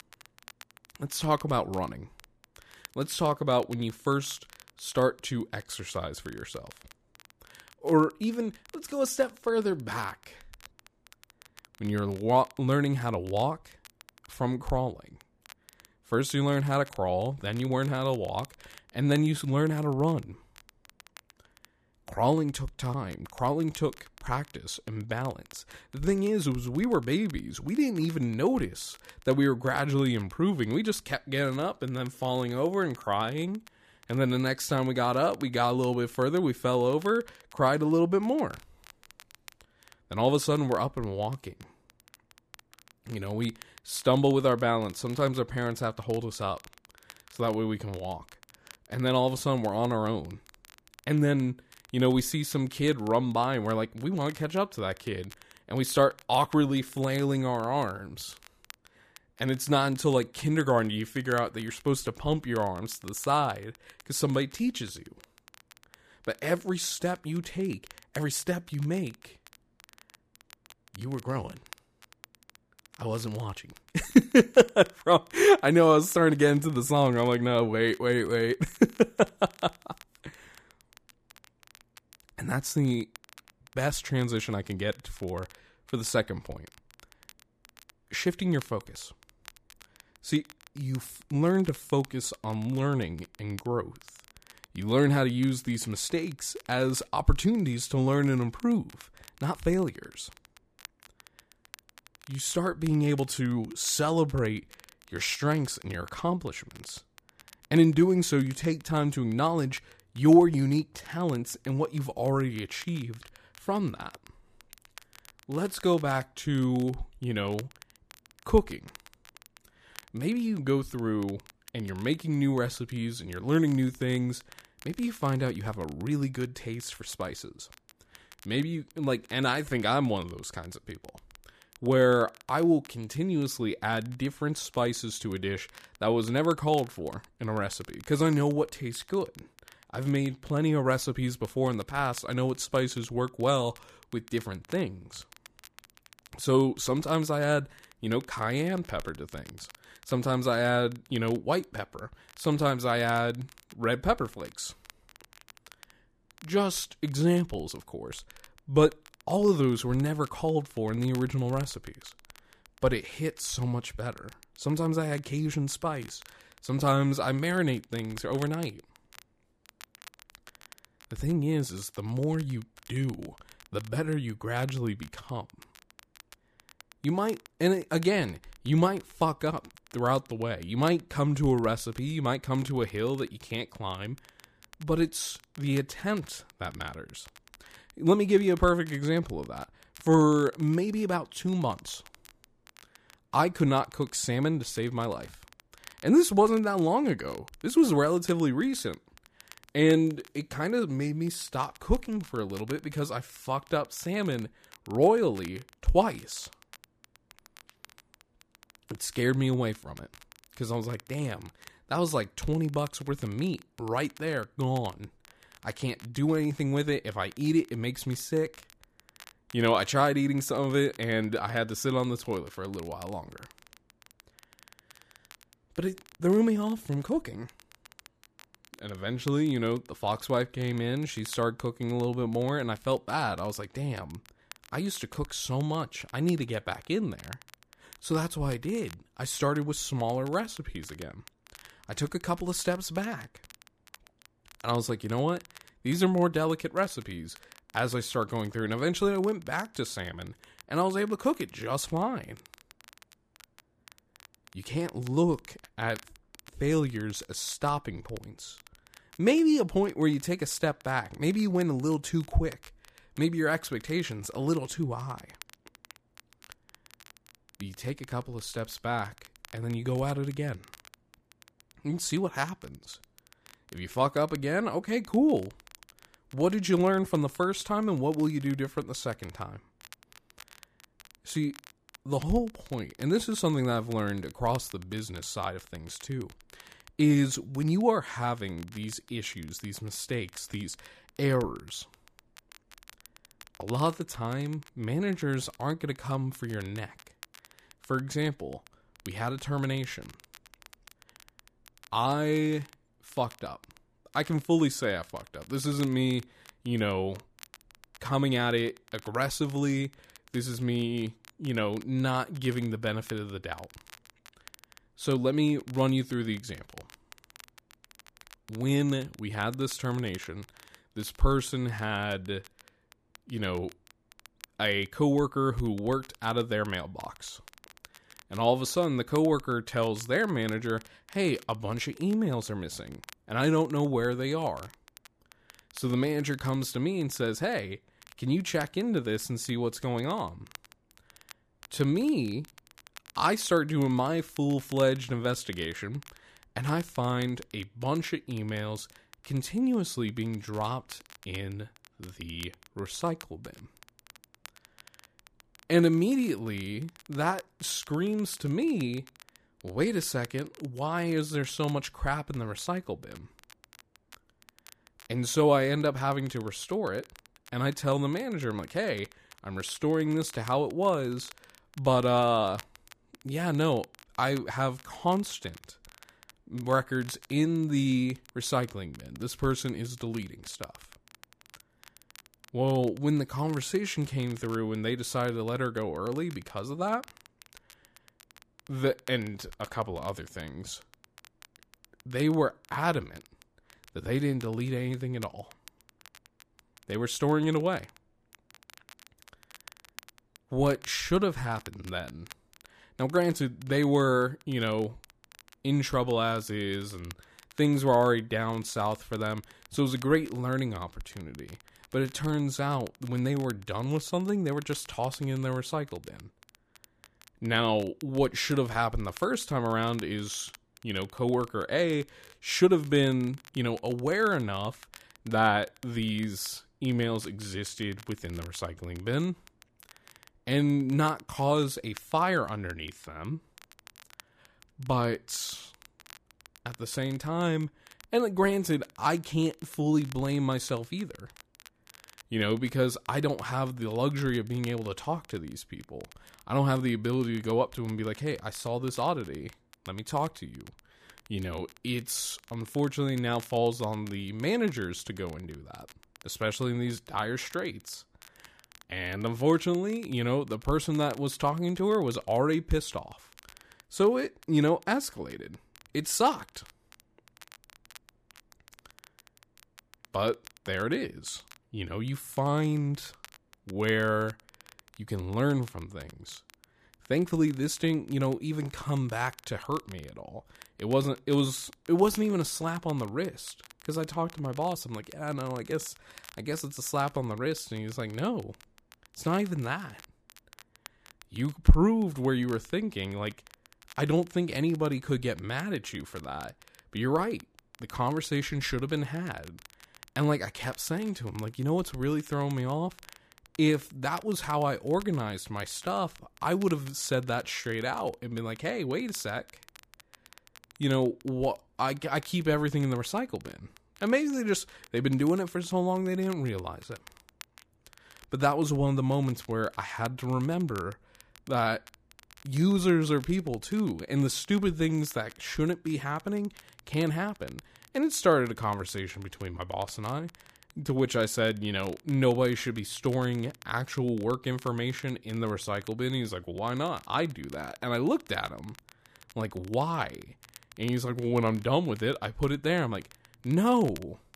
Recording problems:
crackle, like an old record; faint; 25 dB below the speech

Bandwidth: 14.5 kHz